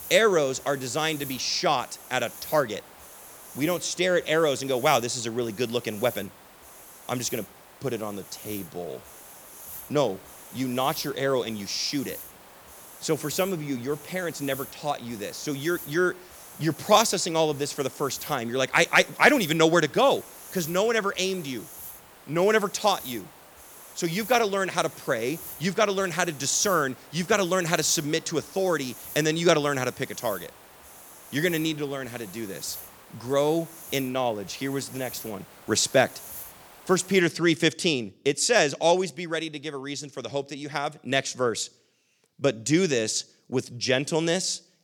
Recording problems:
hiss; noticeable; until 37 s; 15 dB below the speech

